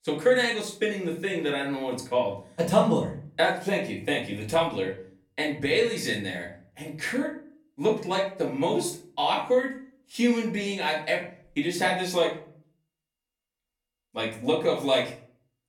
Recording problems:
off-mic speech; far
room echo; slight; dies away in 0.4 s

